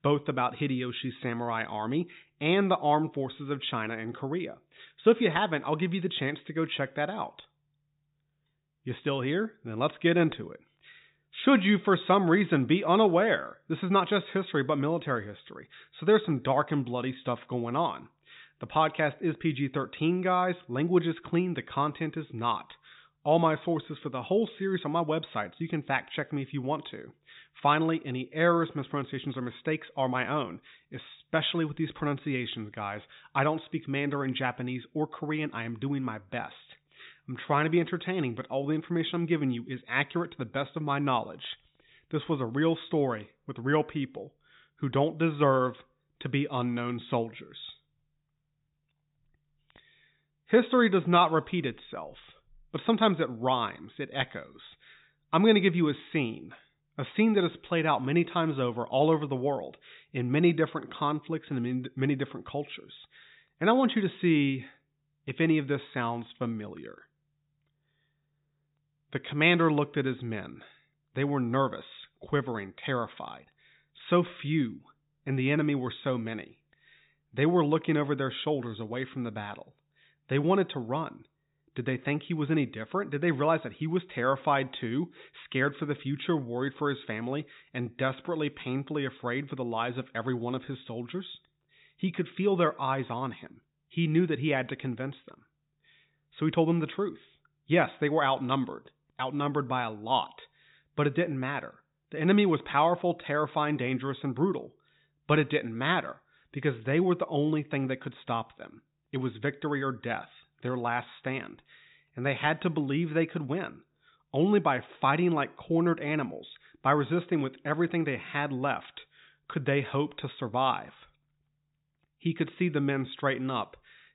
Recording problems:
high frequencies cut off; severe; nothing above 4 kHz

